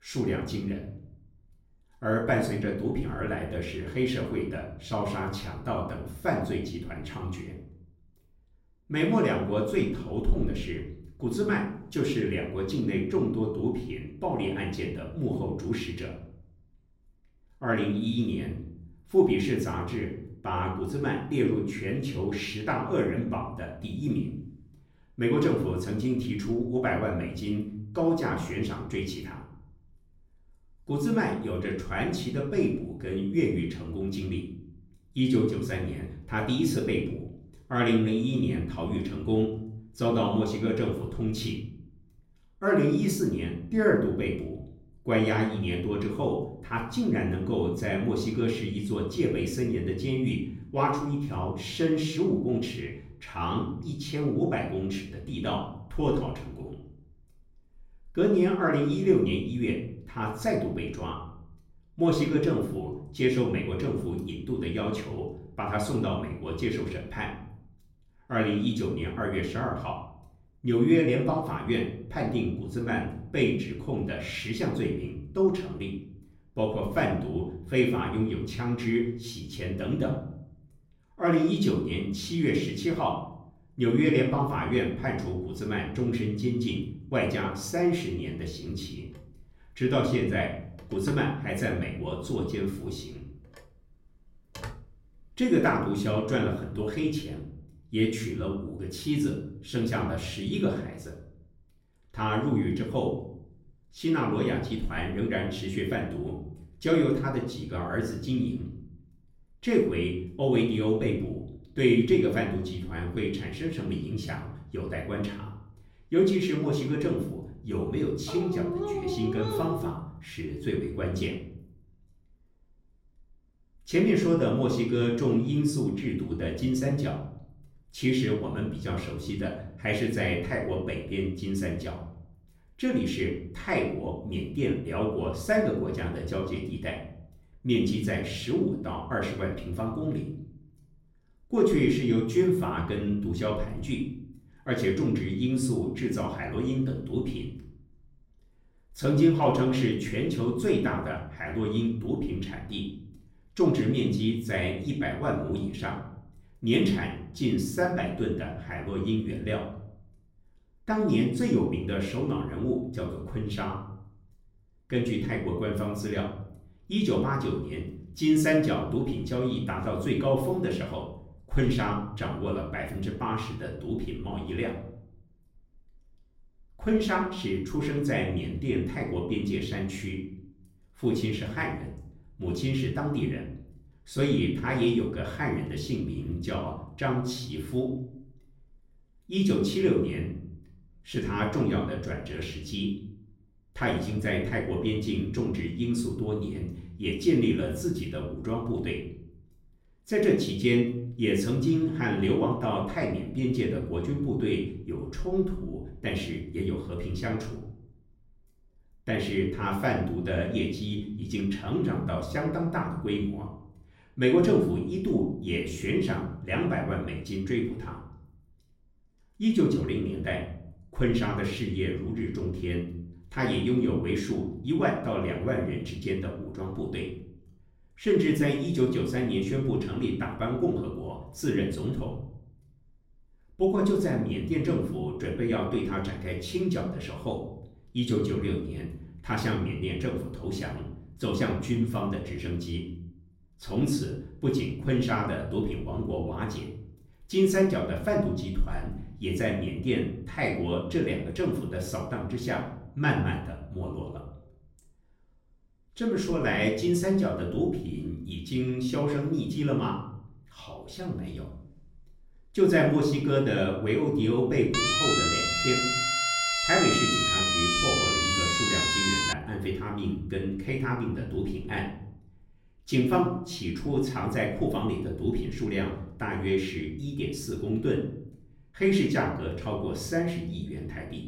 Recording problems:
off-mic speech; far
room echo; slight; dies away in 0.7 s
phone ringing; faint; from 1:29 to 1:36; peak 10 dB below the speech
dog barking; noticeable; from 1:58 to 2:00; peak 2 dB below the speech
siren; loud; from 4:25 to 4:29; peak 6 dB above the speech

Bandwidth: 16 kHz